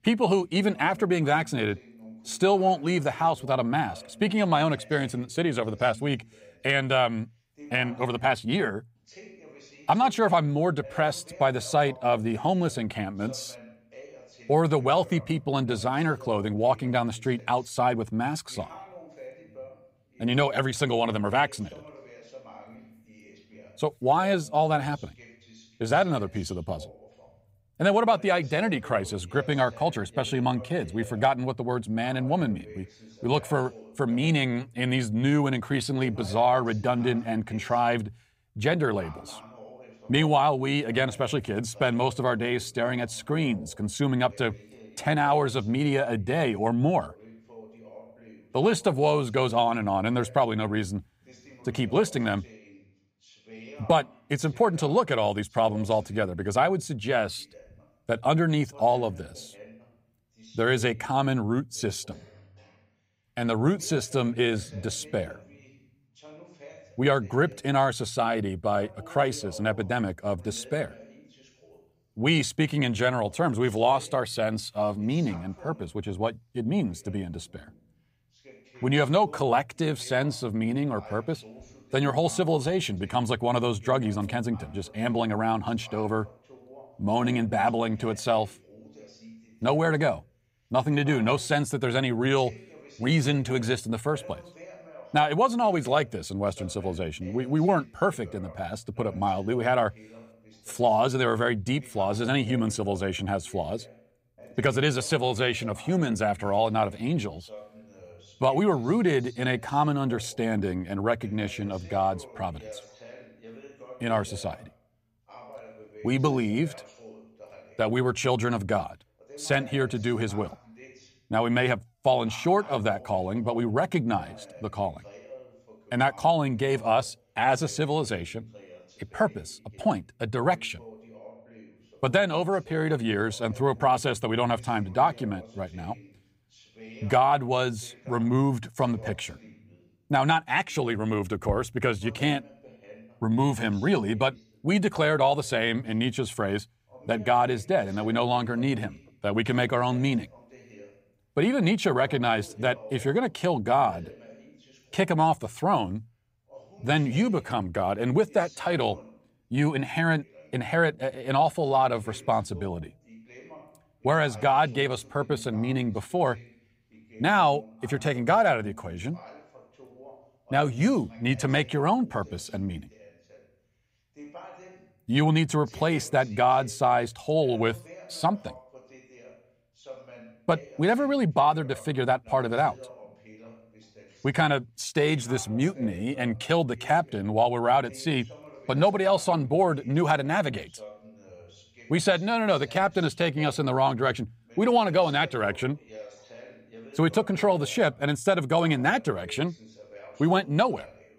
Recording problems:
voice in the background; faint; throughout; 25 dB below the speech

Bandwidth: 15.5 kHz